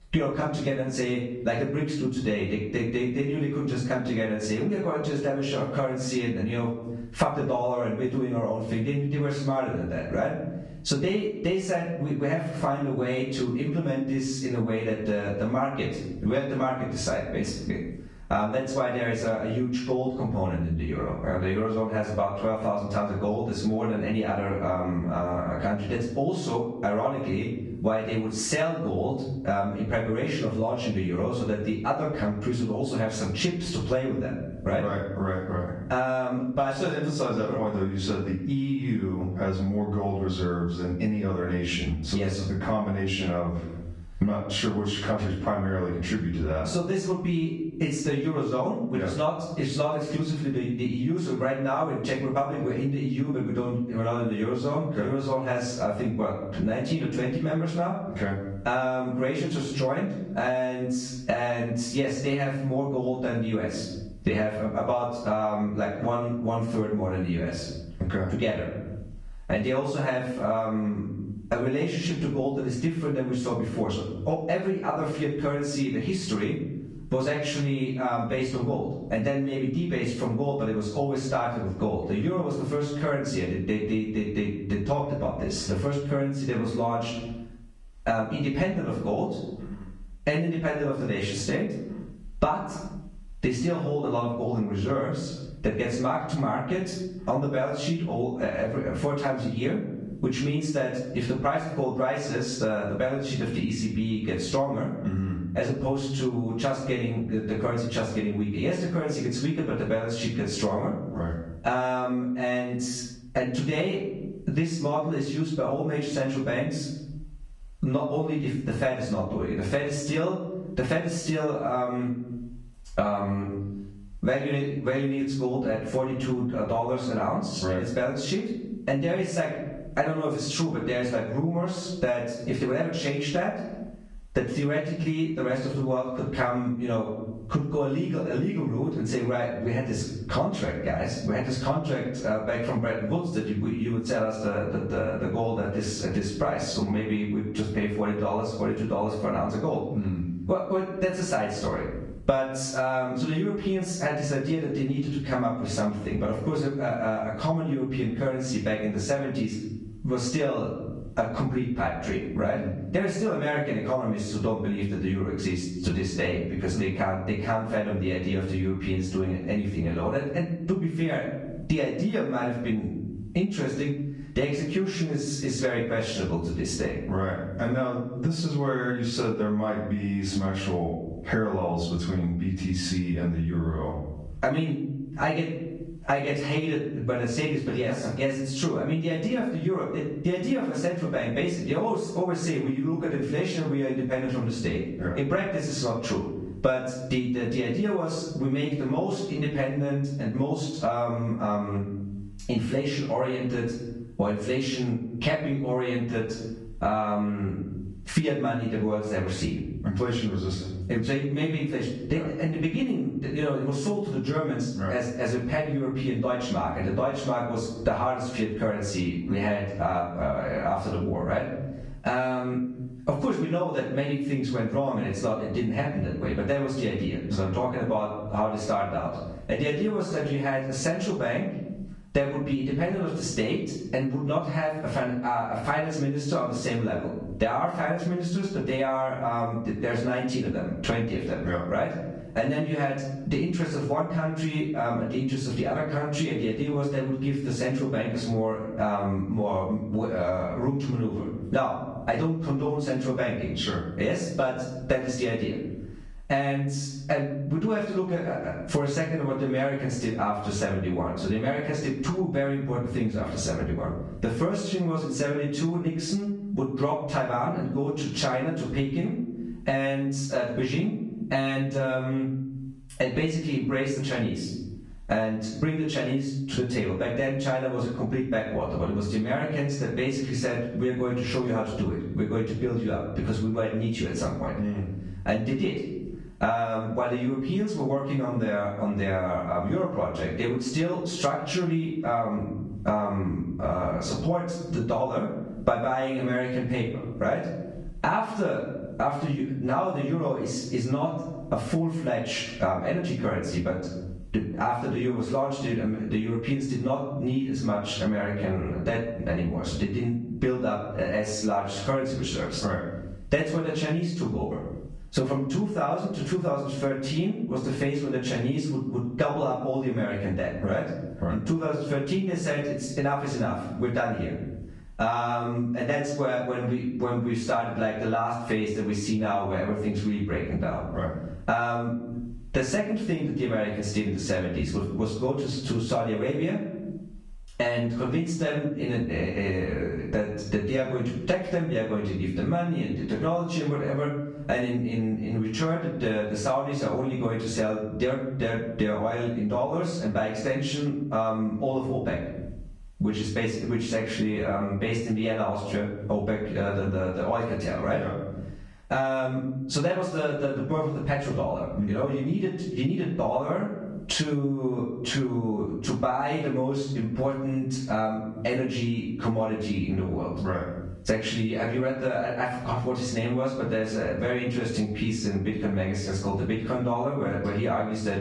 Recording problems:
off-mic speech; far
room echo; noticeable; dies away in 0.5 s
garbled, watery; slightly
squashed, flat; somewhat

